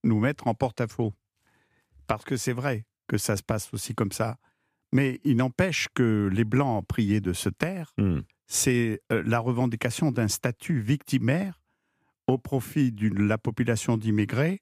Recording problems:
none

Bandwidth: 15 kHz